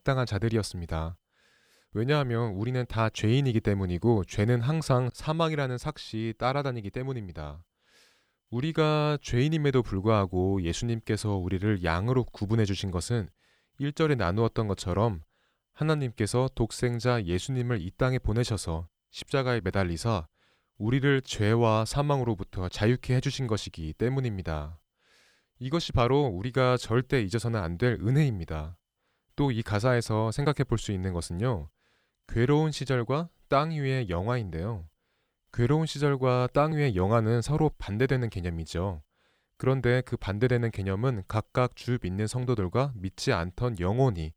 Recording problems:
none

